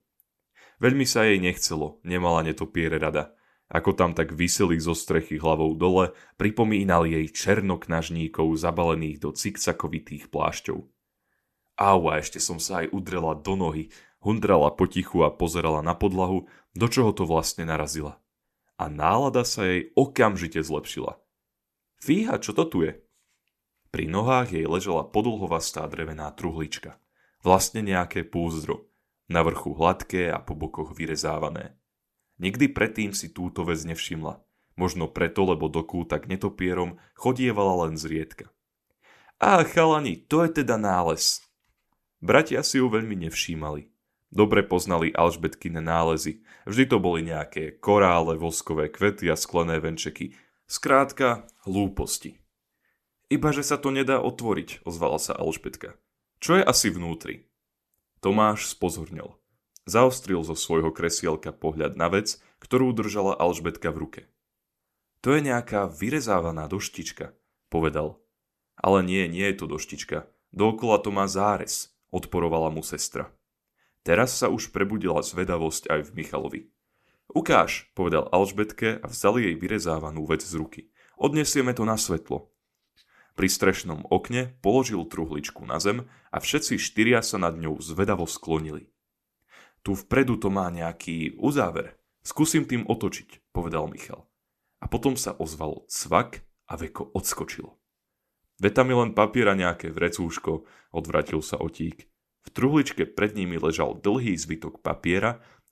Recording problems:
none

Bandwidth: 13.5 kHz